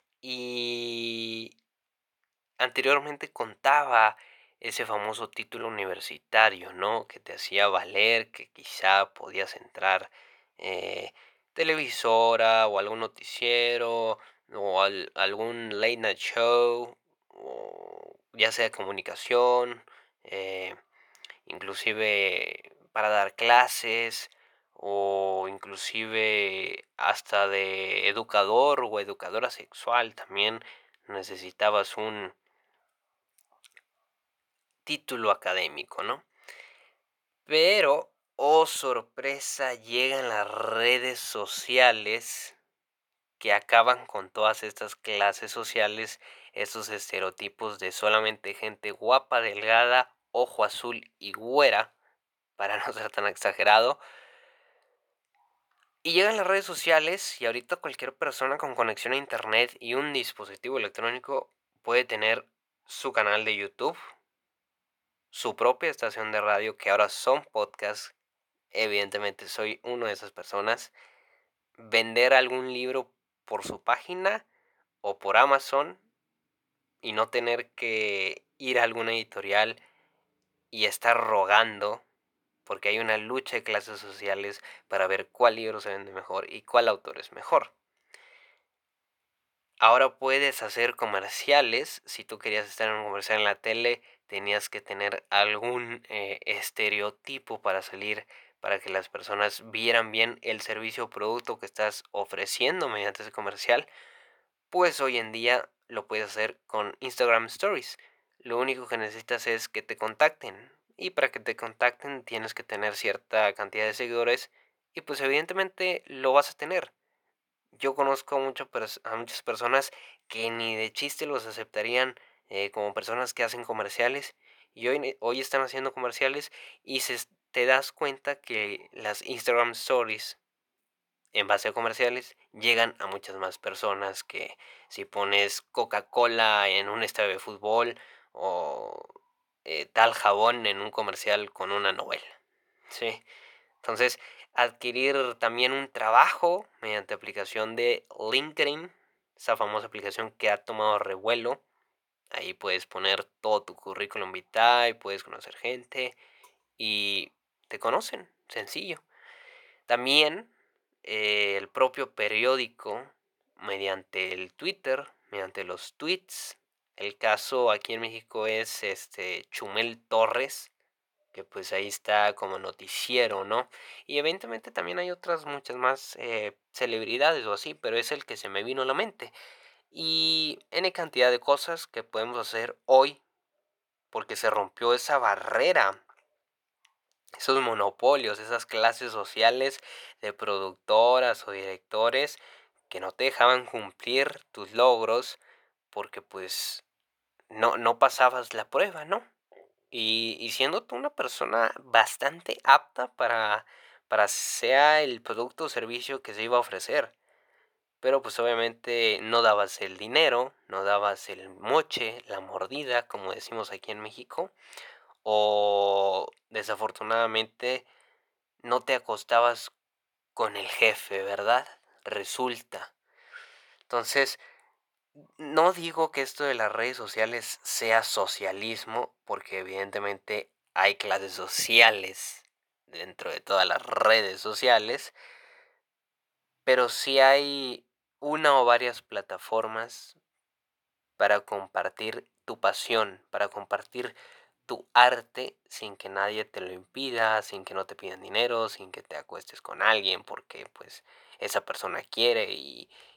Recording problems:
thin; very; fading below 700 Hz

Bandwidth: 19 kHz